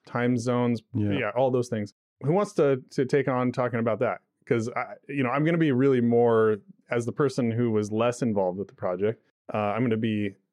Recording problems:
muffled; slightly; fading above 3.5 kHz

